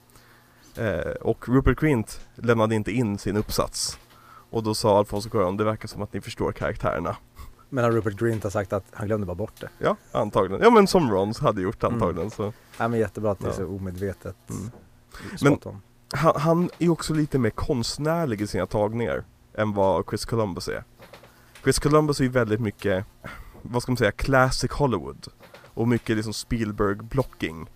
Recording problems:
electrical hum; faint; throughout; 60 Hz, 30 dB below the speech

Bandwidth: 15 kHz